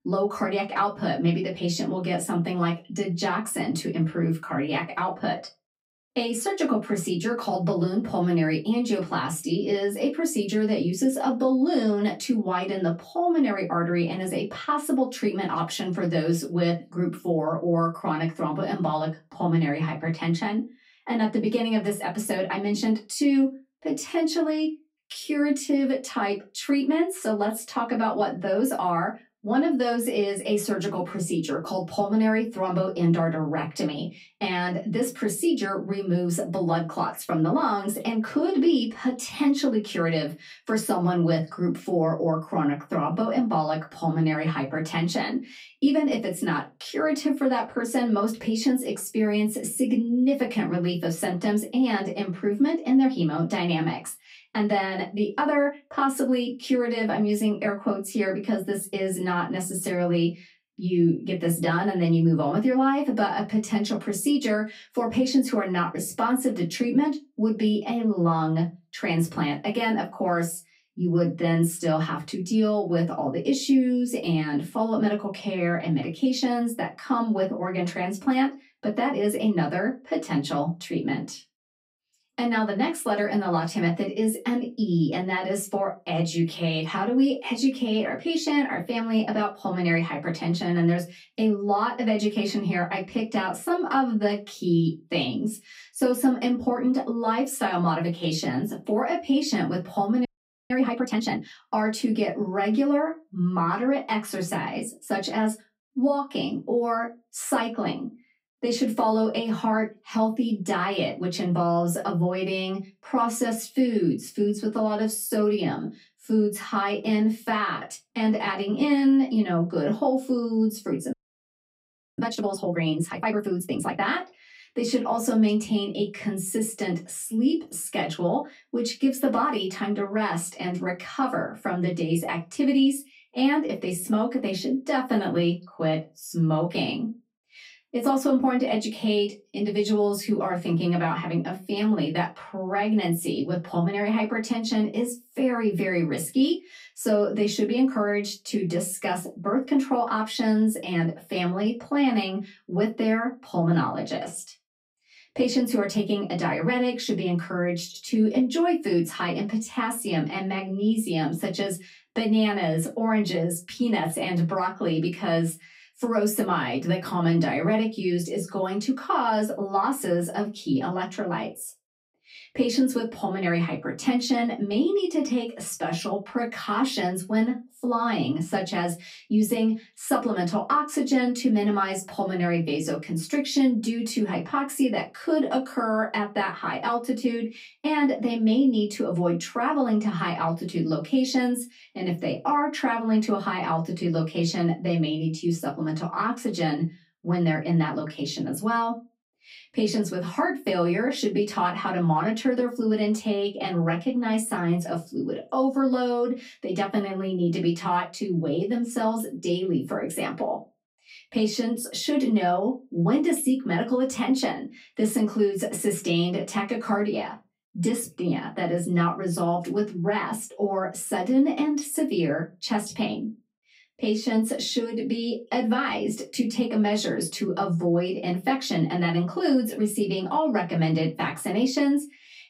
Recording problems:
off-mic speech; far
room echo; very slight; dies away in 0.2 s
audio freezing; at 1:40 and at 2:01 for 1 s

